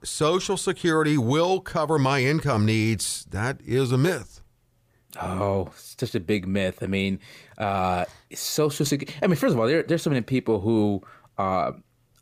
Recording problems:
none

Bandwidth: 15 kHz